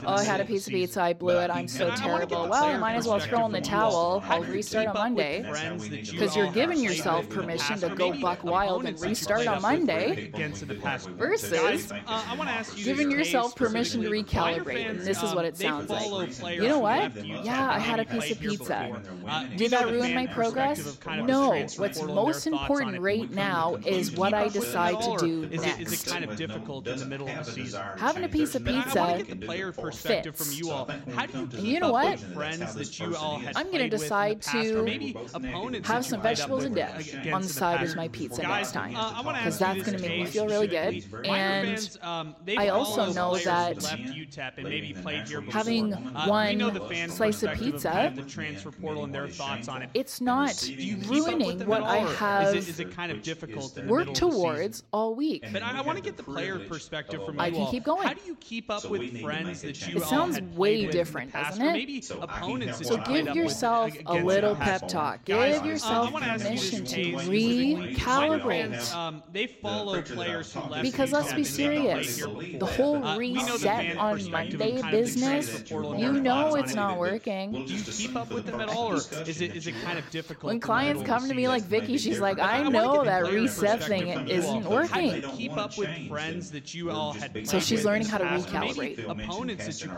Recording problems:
background chatter; loud; throughout; 2 voices, 5 dB below the speech

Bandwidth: 16 kHz